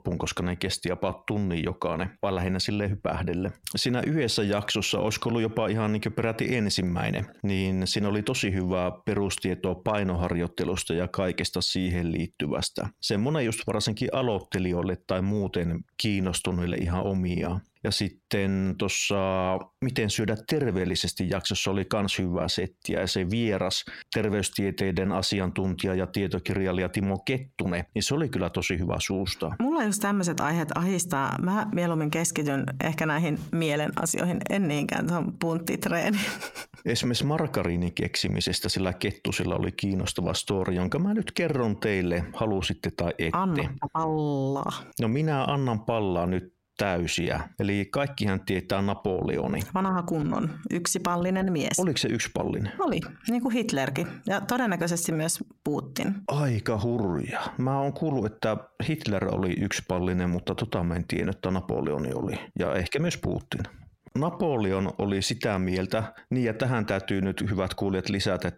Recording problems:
squashed, flat; heavily

